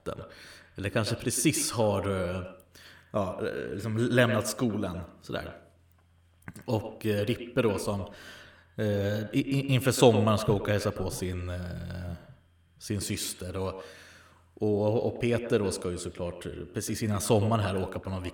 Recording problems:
echo of what is said; strong; throughout; 110 ms later, 10 dB below the speech

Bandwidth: 18 kHz